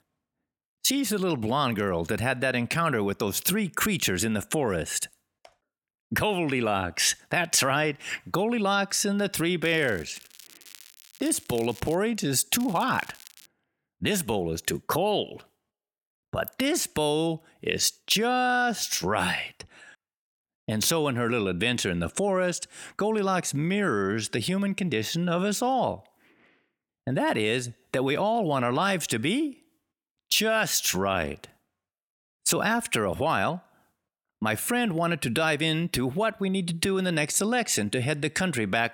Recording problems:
crackling; faint; from 9.5 to 12 s and at 13 s; 20 dB below the speech

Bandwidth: 17 kHz